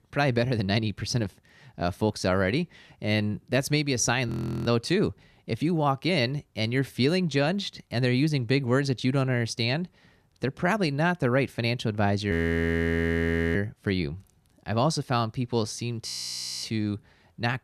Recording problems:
audio freezing; at 4.5 s, at 12 s for 1 s and at 16 s for 0.5 s

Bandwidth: 14.5 kHz